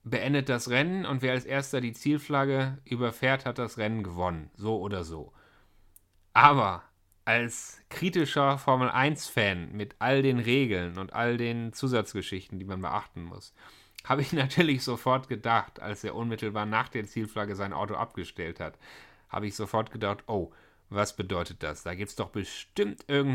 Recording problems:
abrupt cut into speech; at the end

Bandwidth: 16.5 kHz